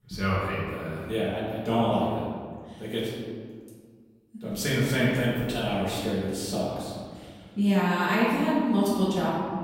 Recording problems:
room echo; strong; dies away in 1.7 s
off-mic speech; far

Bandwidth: 16 kHz